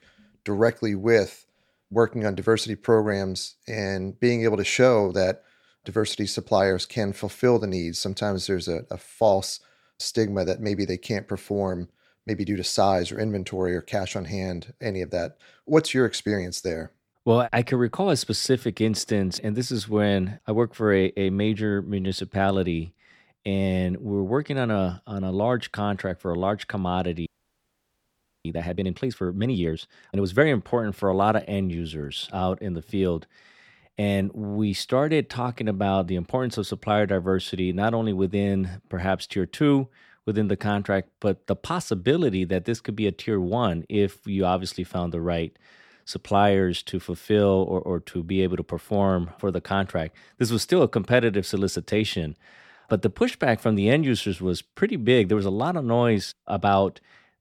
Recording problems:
audio freezing; at 27 s for 1 s

